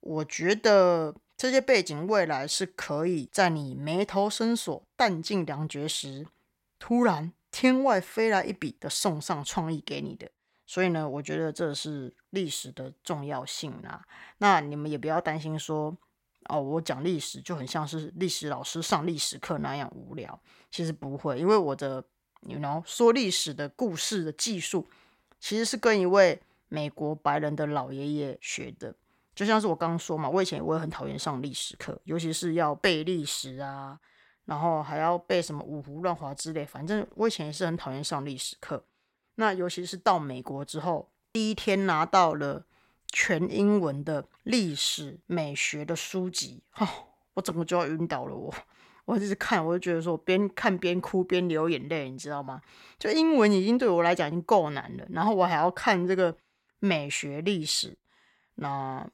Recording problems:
none

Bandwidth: 16.5 kHz